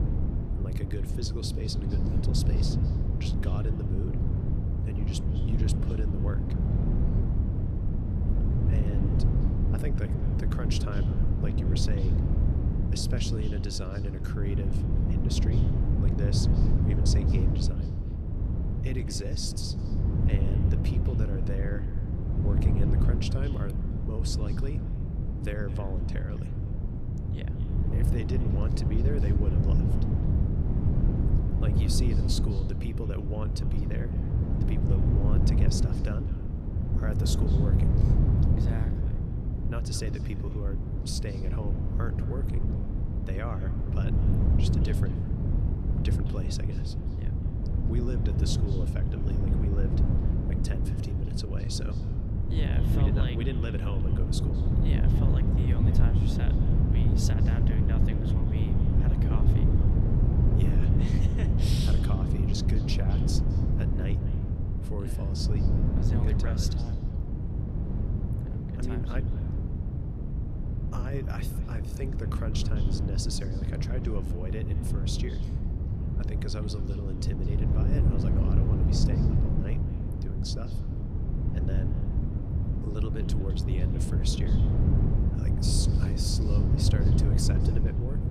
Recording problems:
echo of what is said; faint; throughout; 210 ms later, 20 dB below the speech
wind noise on the microphone; heavy; 1 dB above the speech

